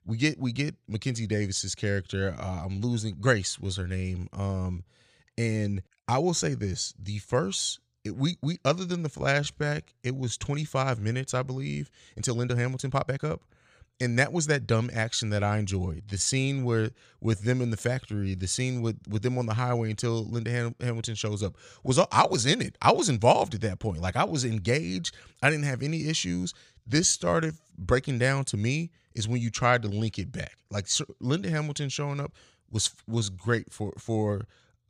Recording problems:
uneven, jittery; strongly; from 9 to 34 s

